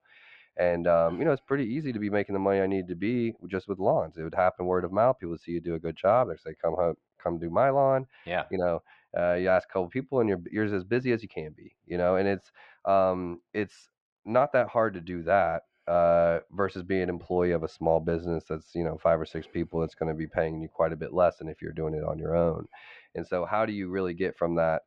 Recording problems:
muffled; very; fading above 3 kHz

